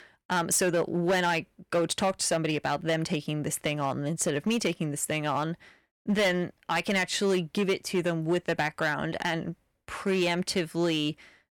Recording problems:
distortion; slight; 7% of the sound clipped

